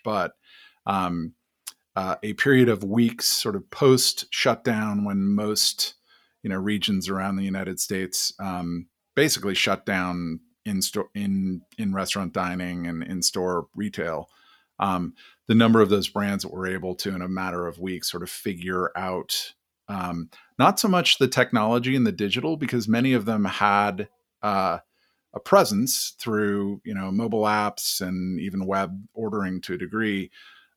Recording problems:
none

